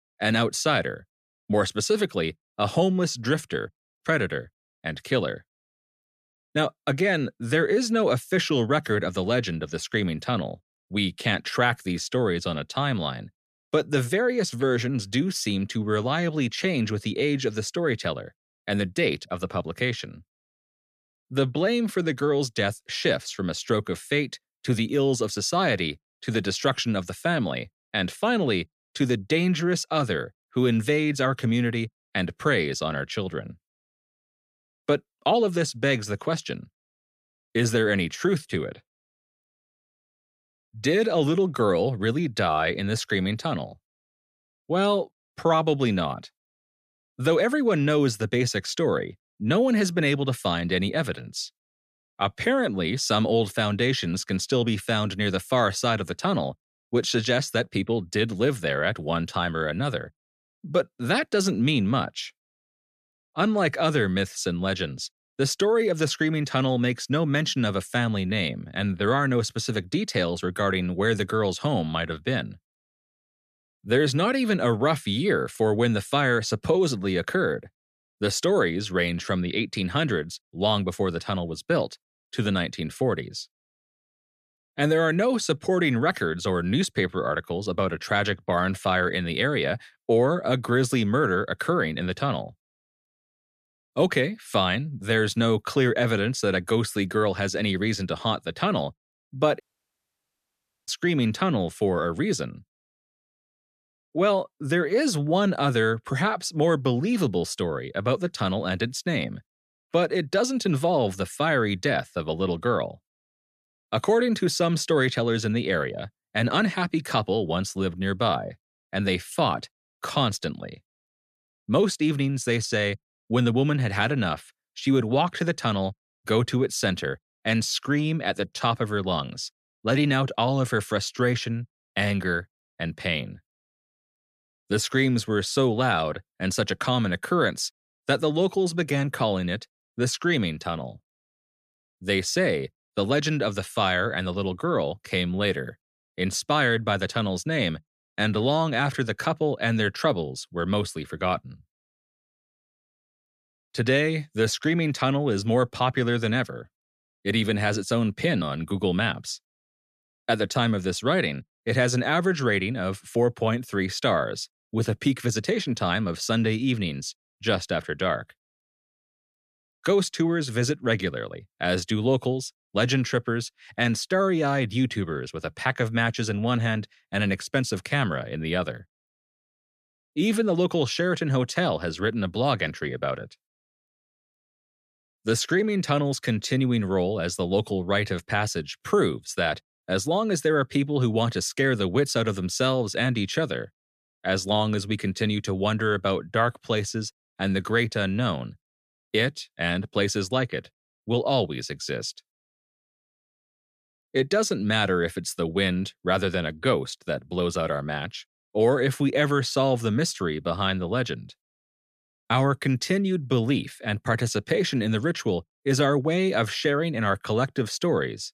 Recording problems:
audio cutting out; at 1:40 for 1.5 s

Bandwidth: 14 kHz